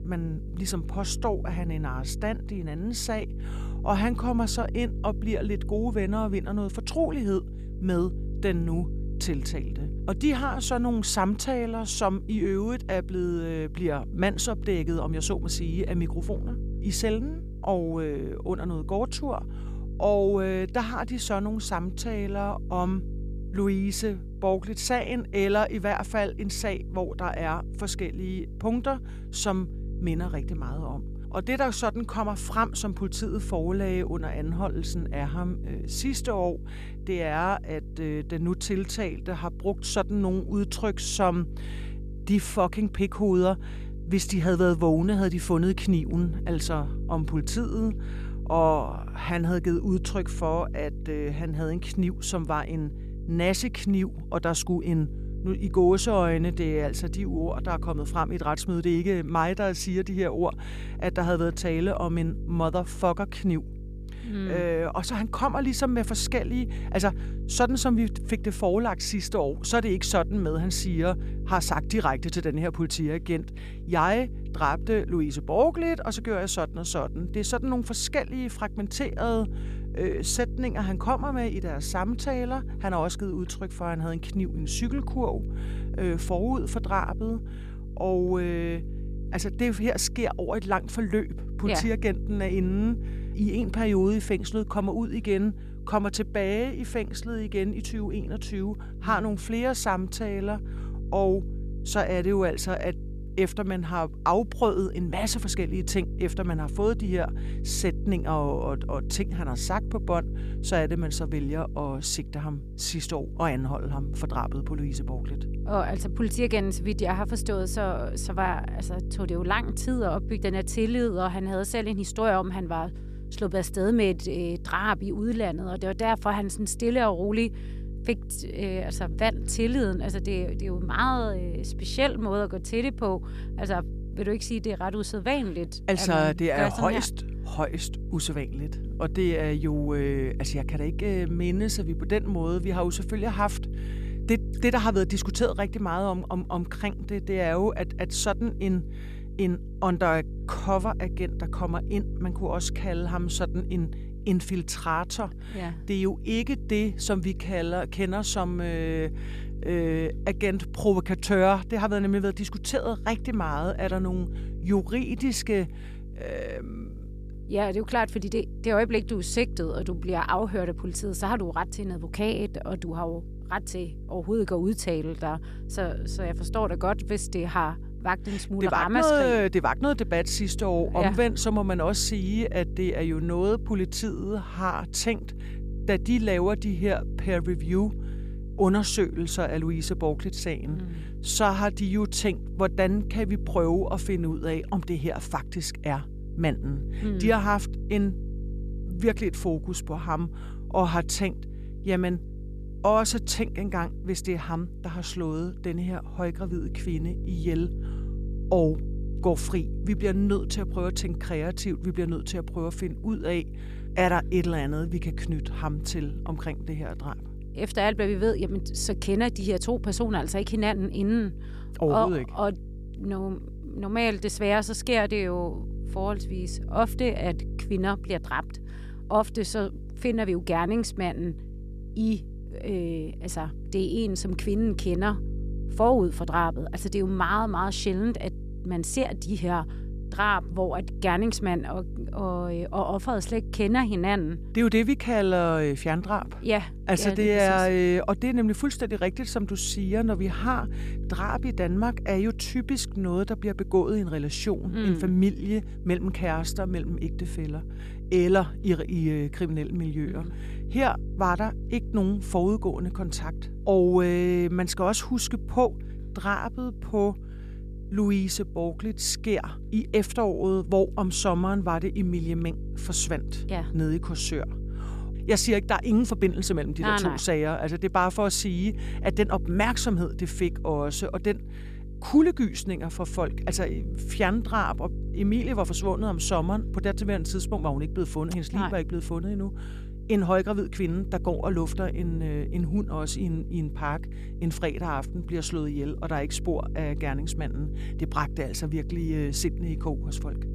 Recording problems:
electrical hum; noticeable; throughout; 50 Hz, 20 dB below the speech

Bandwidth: 14.5 kHz